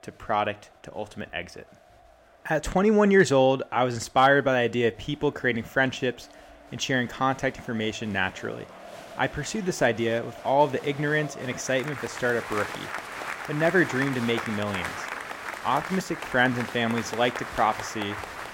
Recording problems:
crowd noise; noticeable; throughout; 10 dB below the speech

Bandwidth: 16 kHz